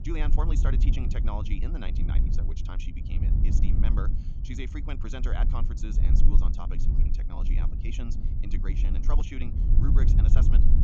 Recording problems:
wrong speed, natural pitch; too fast; 1.5 times normal speed
high frequencies cut off; noticeable; nothing above 8 kHz
low rumble; loud; throughout; 3 dB below the speech

